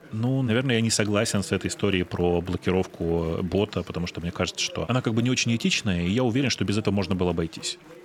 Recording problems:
chatter from many people; faint; throughout; 20 dB below the speech

